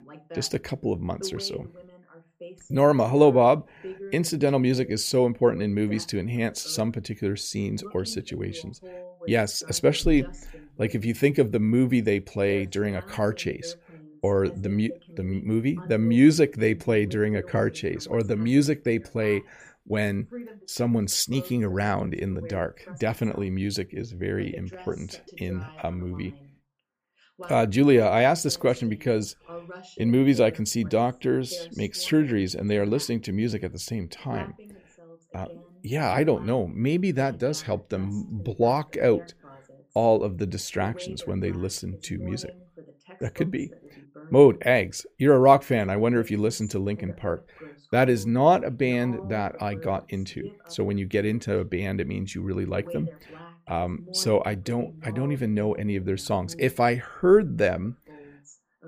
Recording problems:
voice in the background; faint; throughout; 20 dB below the speech

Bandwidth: 15 kHz